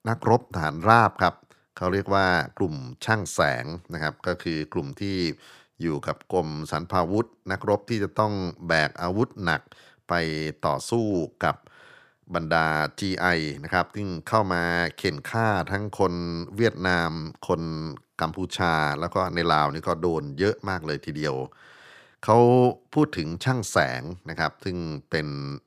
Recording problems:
none

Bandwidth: 15 kHz